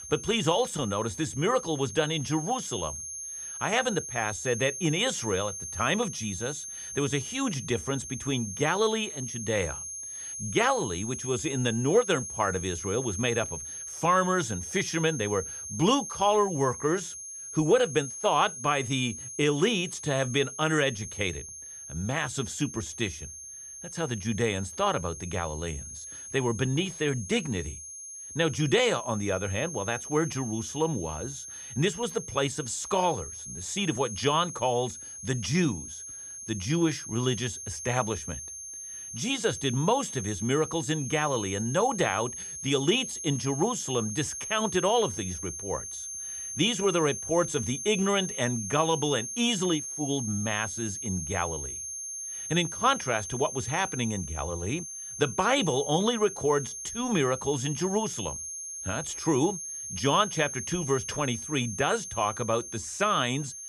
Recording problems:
high-pitched whine; loud; throughout; 6.5 kHz, 8 dB below the speech

